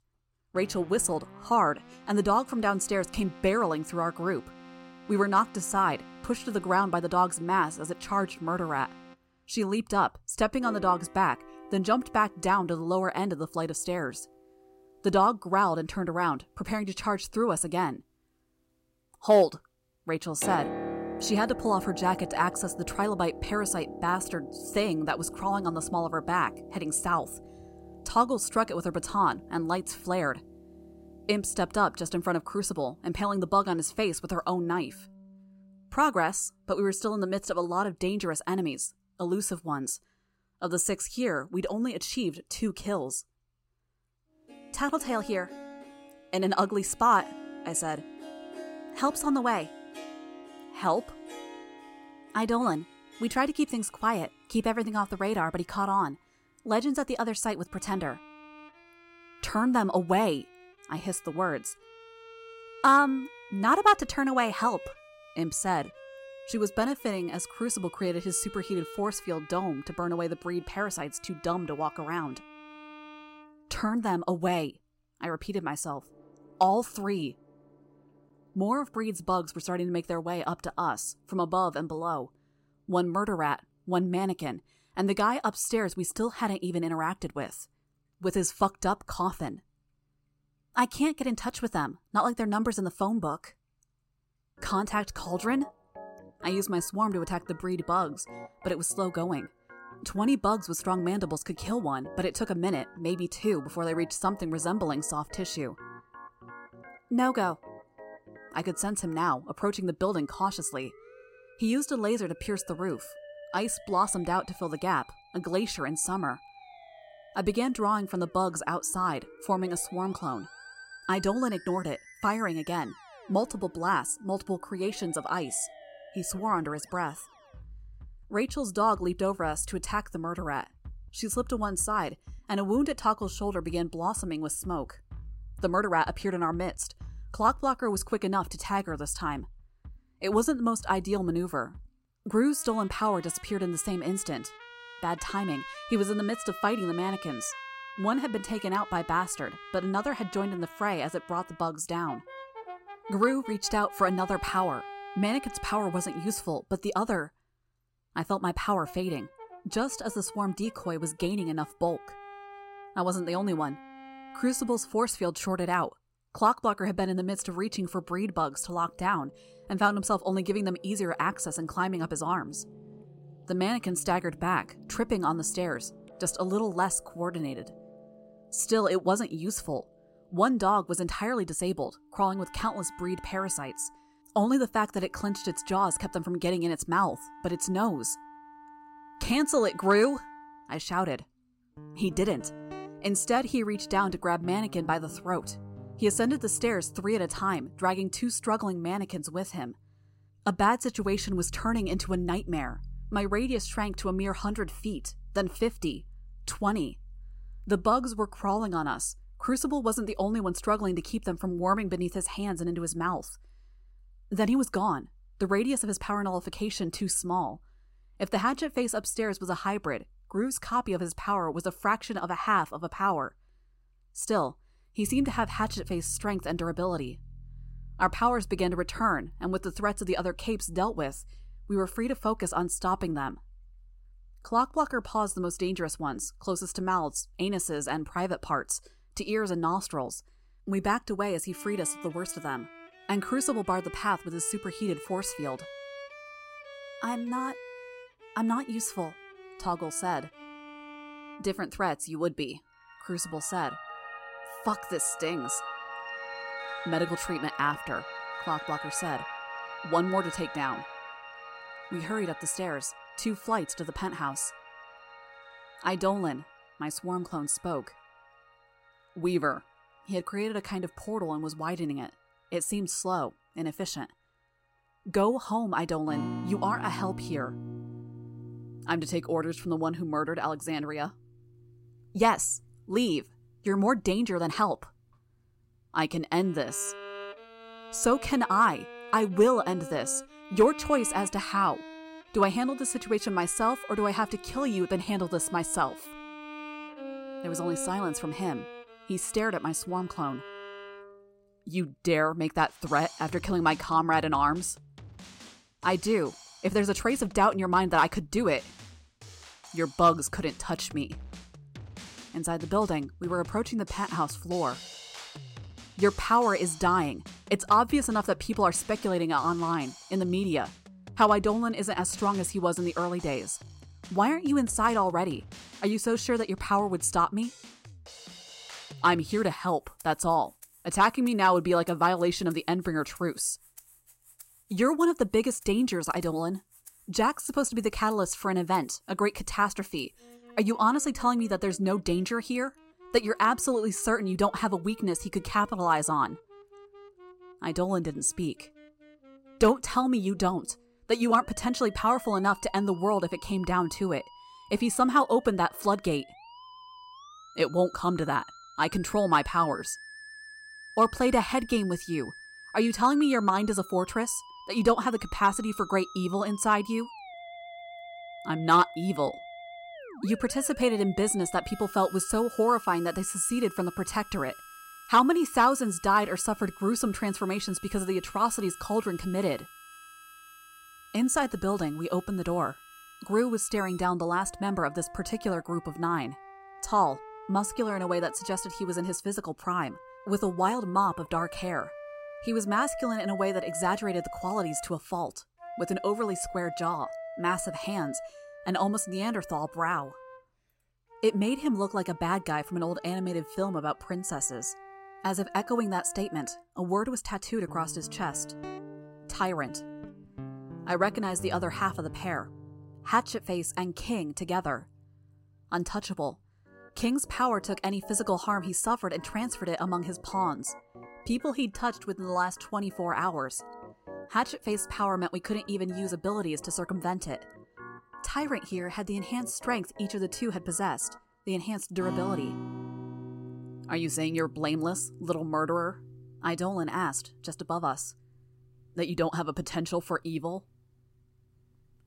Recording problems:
background music; noticeable; throughout; 15 dB below the speech

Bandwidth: 16 kHz